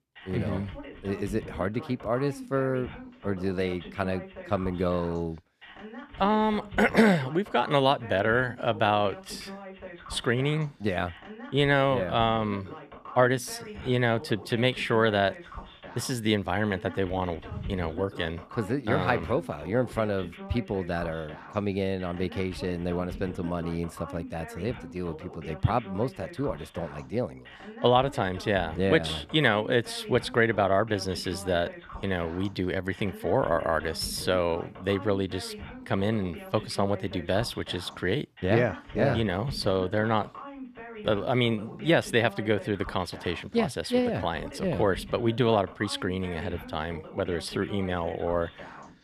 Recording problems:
voice in the background; noticeable; throughout; 15 dB below the speech

